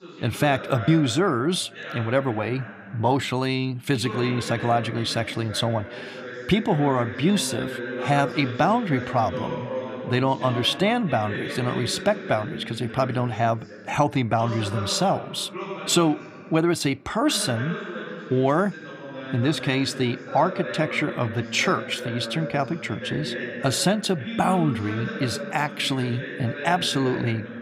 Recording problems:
voice in the background; loud; throughout; 9 dB below the speech

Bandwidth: 15 kHz